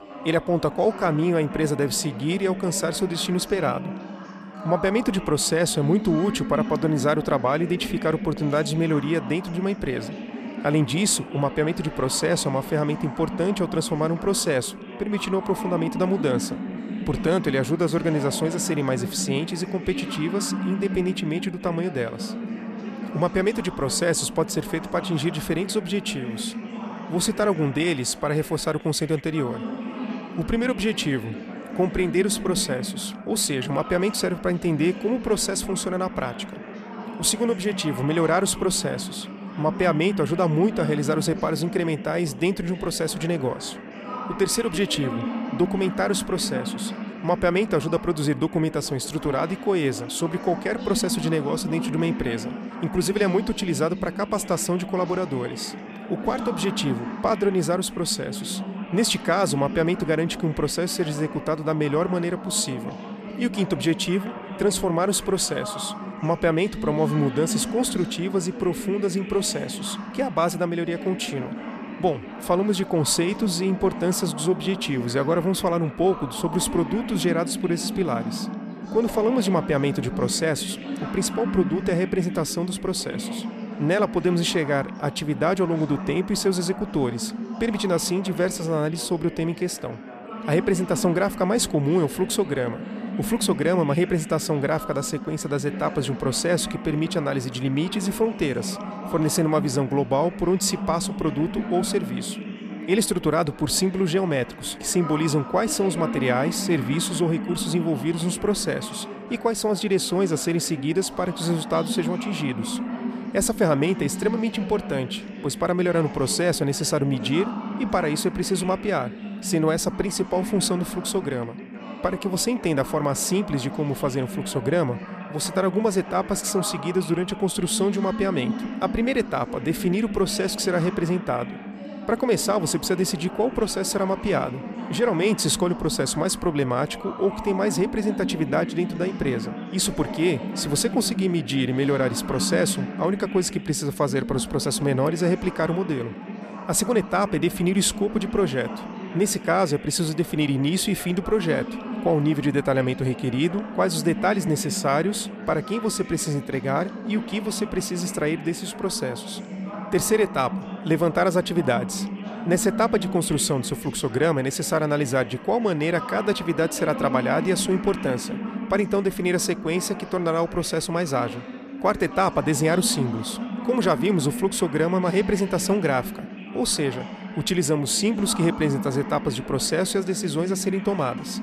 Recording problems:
background chatter; loud; throughout; 4 voices, 9 dB below the speech

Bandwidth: 14.5 kHz